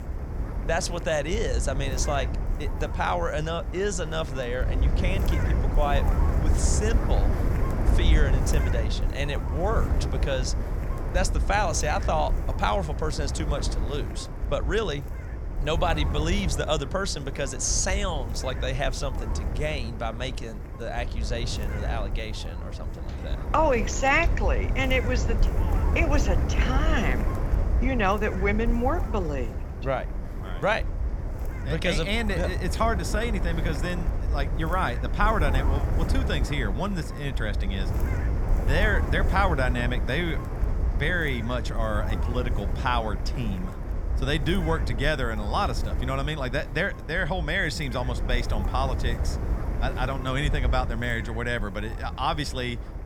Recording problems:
wind noise on the microphone; occasional gusts; 10 dB below the speech

